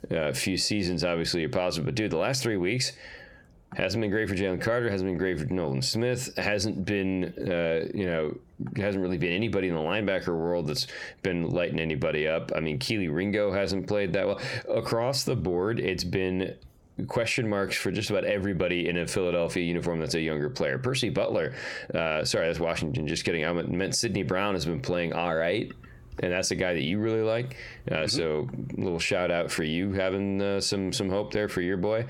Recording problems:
squashed, flat; heavily

